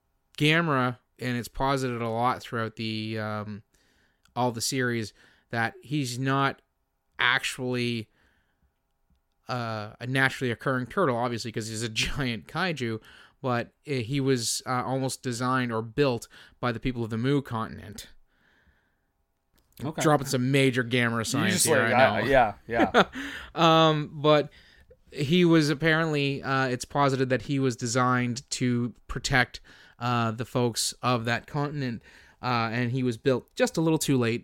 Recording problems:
none

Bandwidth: 16.5 kHz